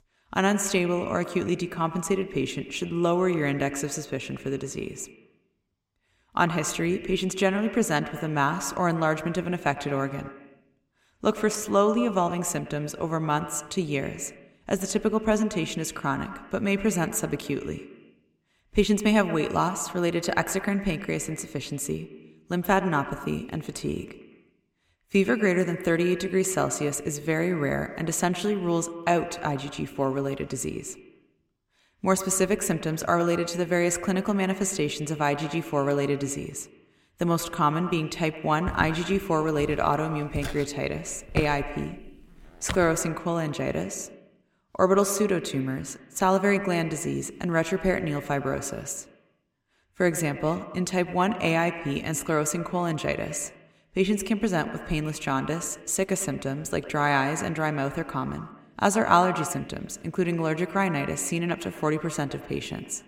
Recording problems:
echo of what is said; strong; throughout; 110 ms later, 10 dB below the speech
footsteps; noticeable; from 39 to 43 s; peak 5 dB below the speech

